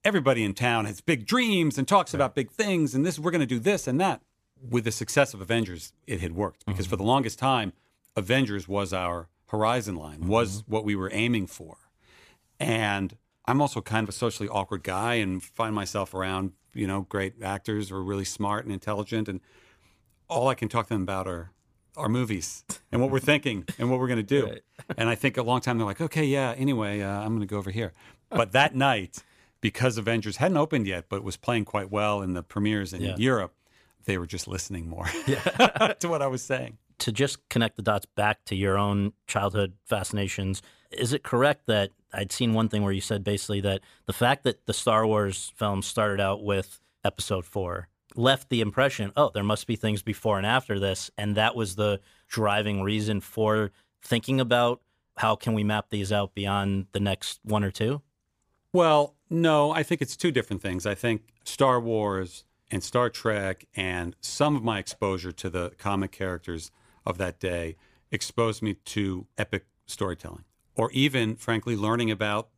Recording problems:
none

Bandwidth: 15 kHz